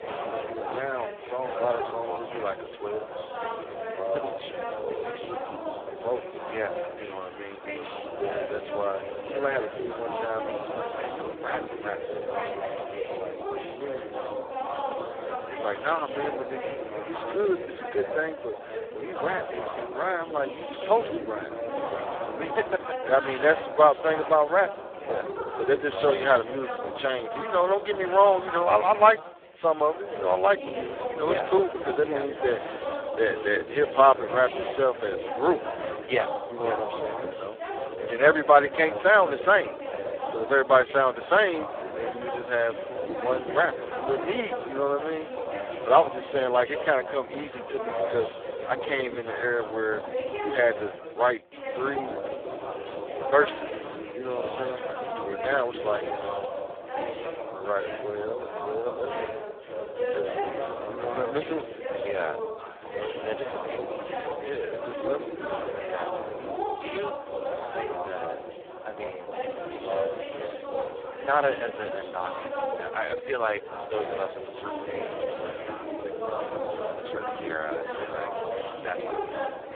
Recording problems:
phone-call audio; poor line
background chatter; loud; throughout; 3 voices, 7 dB below the speech
train or aircraft noise; faint; throughout; 25 dB below the speech

